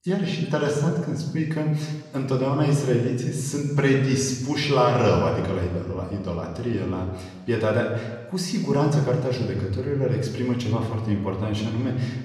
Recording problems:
room echo; noticeable; dies away in 1.2 s
off-mic speech; somewhat distant

